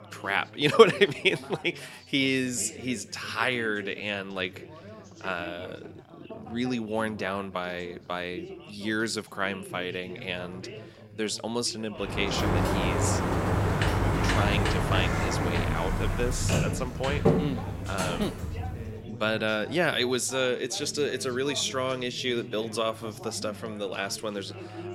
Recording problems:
background chatter; noticeable; throughout; 4 voices, 15 dB below the speech
door banging; loud; from 12 to 19 s; peak 4 dB above the speech

